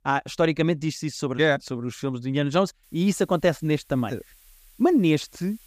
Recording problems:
hiss; faint; from 3 s on; 30 dB below the speech

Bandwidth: 15 kHz